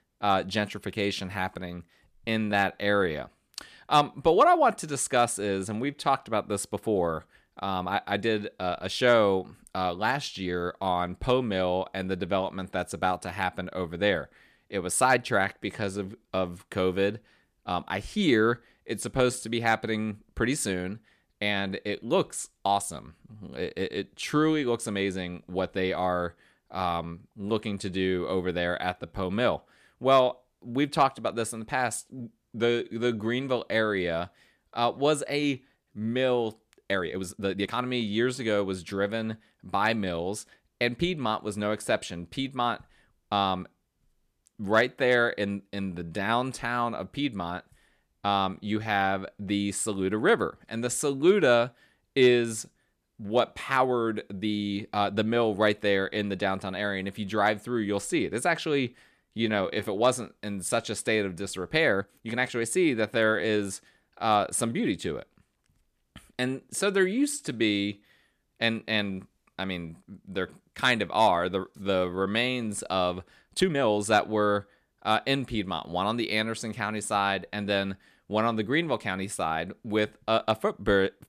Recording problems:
uneven, jittery; strongly; from 2 s to 1:14

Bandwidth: 14.5 kHz